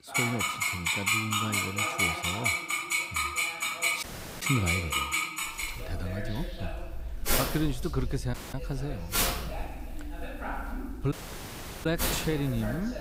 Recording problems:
household noises; very loud; throughout; 5 dB above the speech
voice in the background; loud; throughout; 9 dB below the speech
audio cutting out; at 4 s, at 8.5 s and at 11 s for 0.5 s

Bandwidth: 15.5 kHz